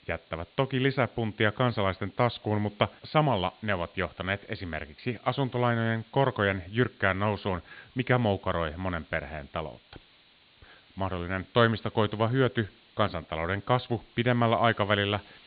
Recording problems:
high frequencies cut off; severe; nothing above 4 kHz
hiss; faint; throughout; 30 dB below the speech

